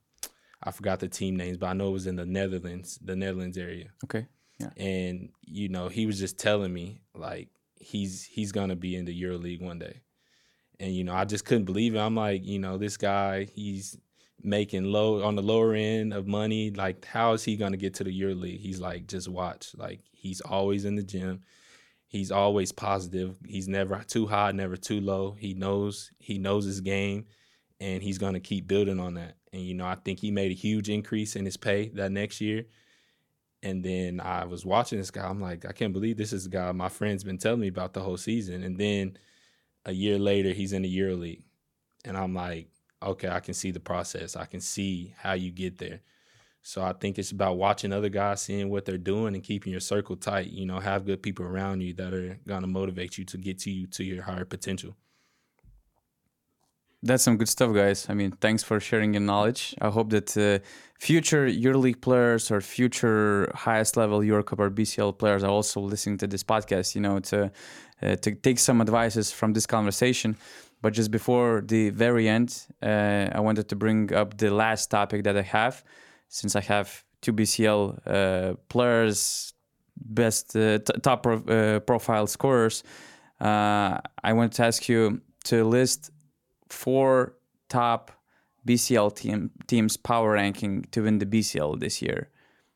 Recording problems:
none

